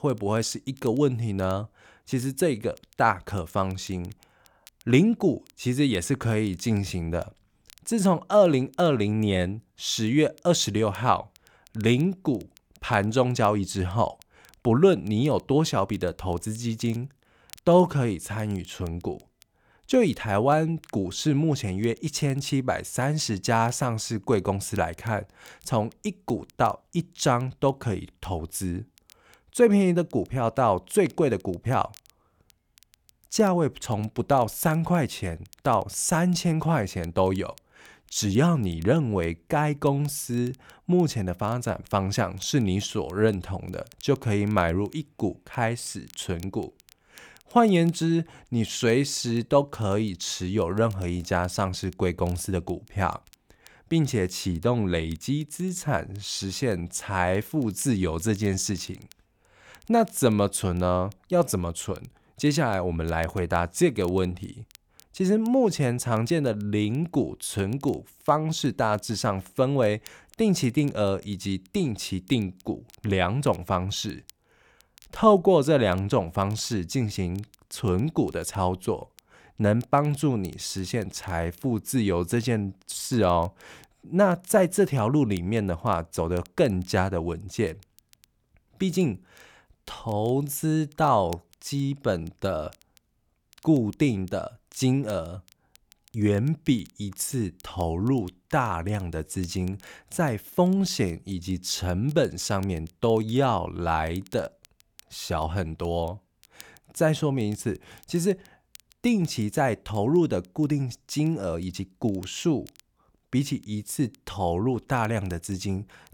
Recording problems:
crackle, like an old record; faint; 30 dB below the speech

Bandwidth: 18.5 kHz